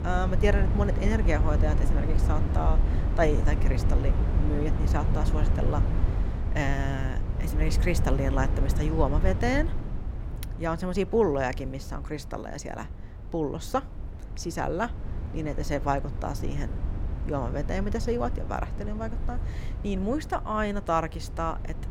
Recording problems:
wind noise on the microphone; heavy; 10 dB below the speech

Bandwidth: 16 kHz